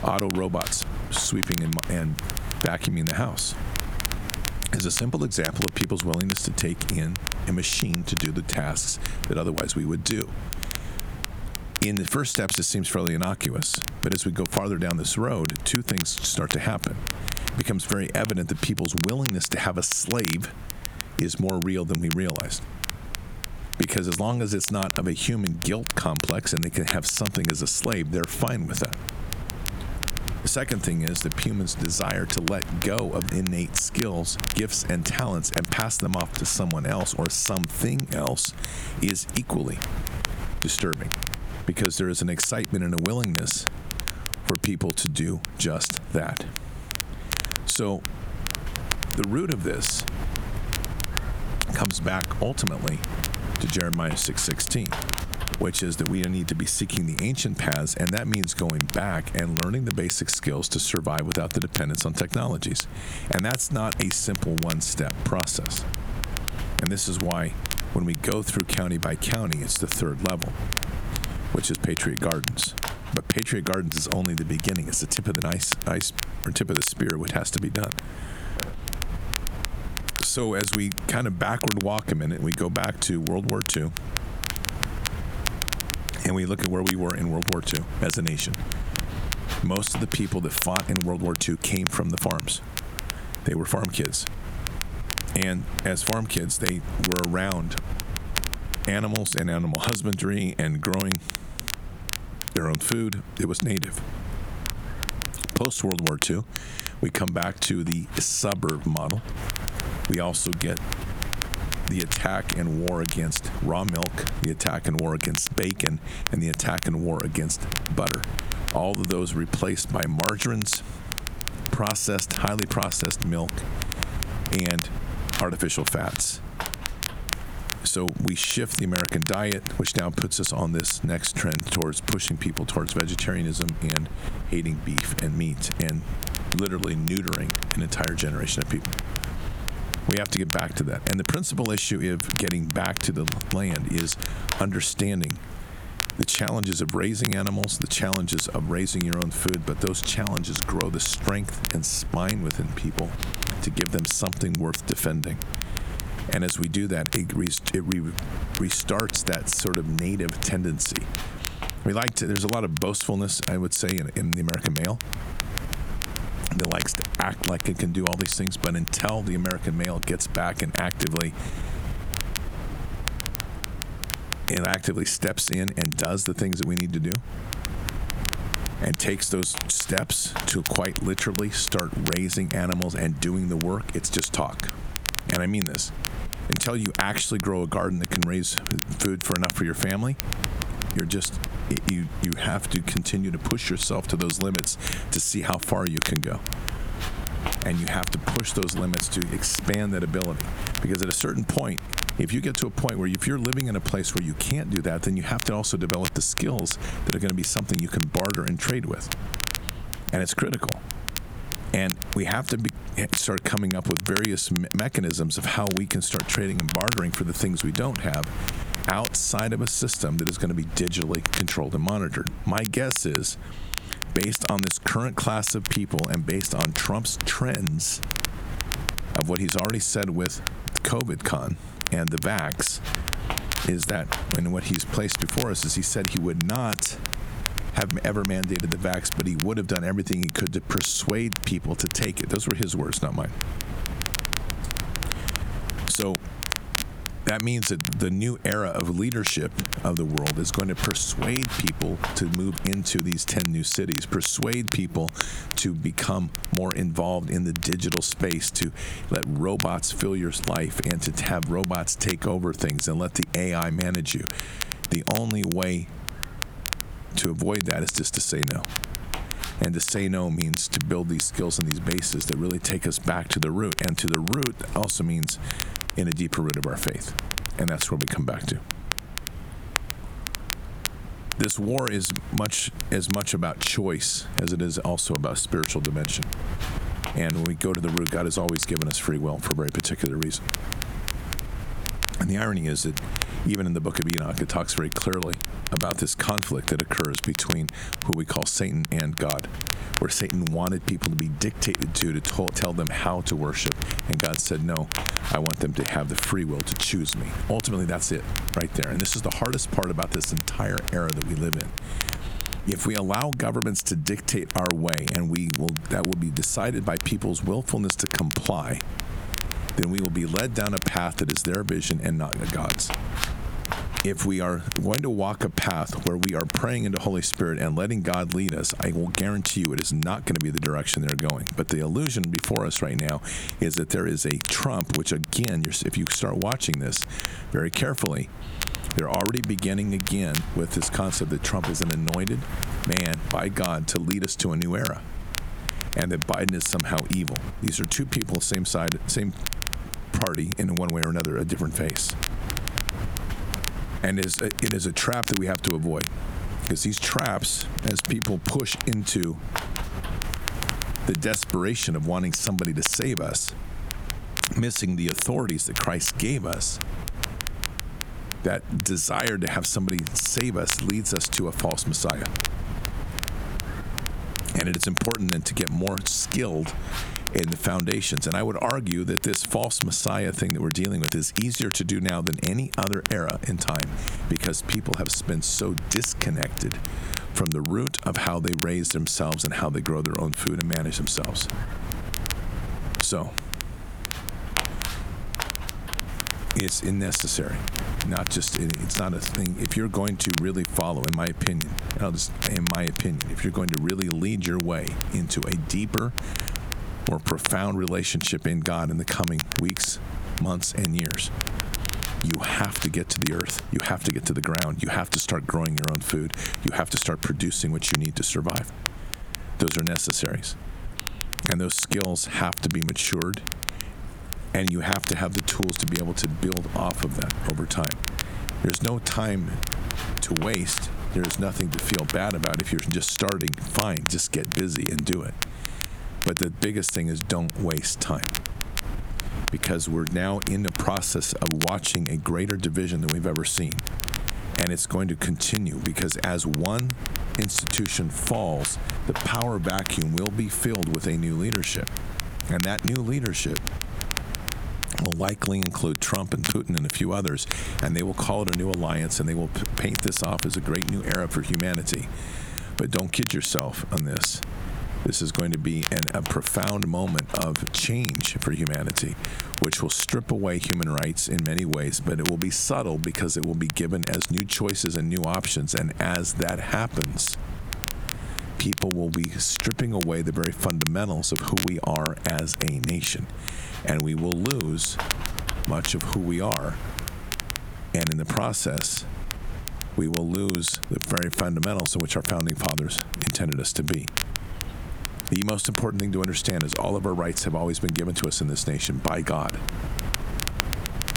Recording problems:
squashed, flat; somewhat
crackle, like an old record; loud; 5 dB below the speech
wind noise on the microphone; occasional gusts; 15 dB below the speech

